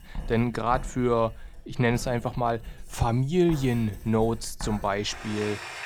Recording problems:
household noises; noticeable; throughout; 15 dB below the speech

